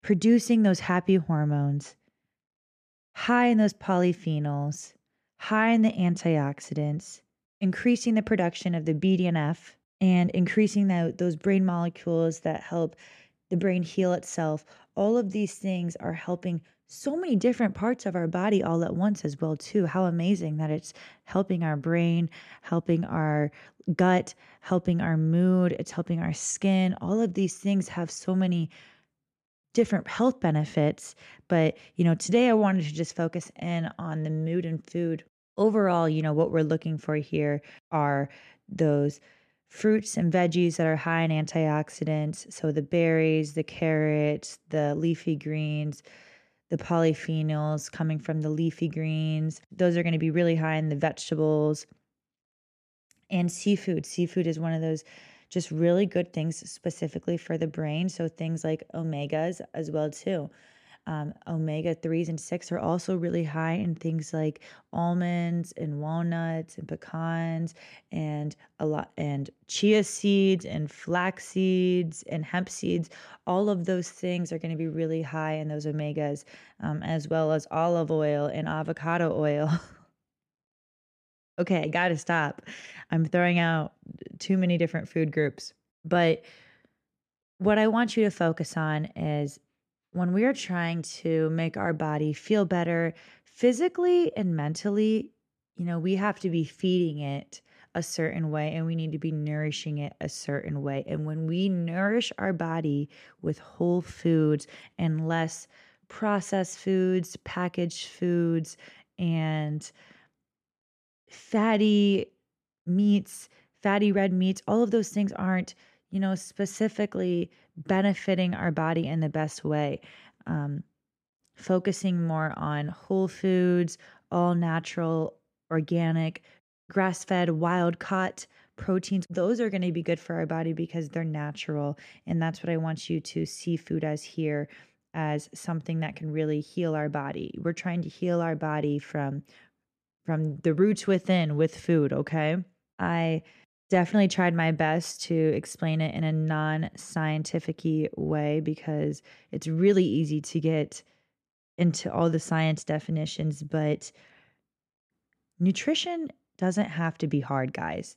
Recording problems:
none

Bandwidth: 14 kHz